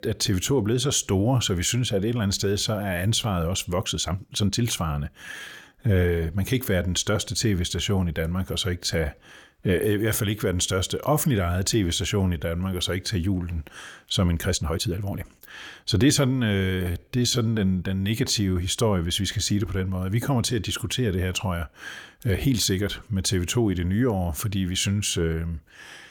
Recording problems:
uneven, jittery; strongly; from 4 to 18 s

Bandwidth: 18 kHz